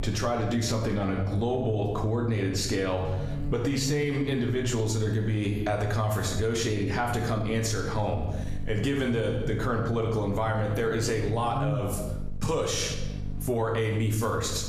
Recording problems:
room echo; slight; dies away in 0.7 s
off-mic speech; somewhat distant
squashed, flat; somewhat
electrical hum; noticeable; throughout; 50 Hz, 20 dB below the speech

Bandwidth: 14.5 kHz